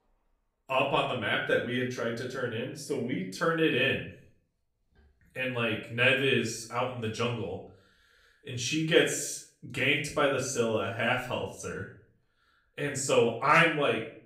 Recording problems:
off-mic speech; far
room echo; slight; dies away in 0.4 s

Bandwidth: 15.5 kHz